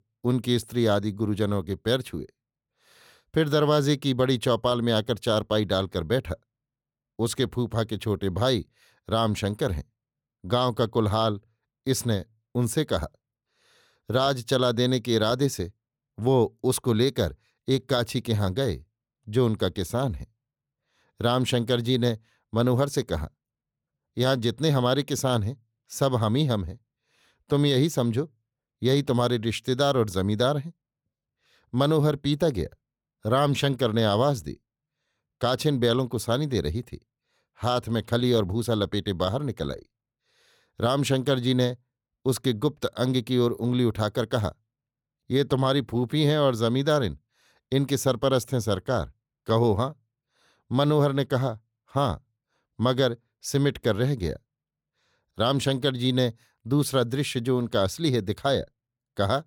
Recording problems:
none

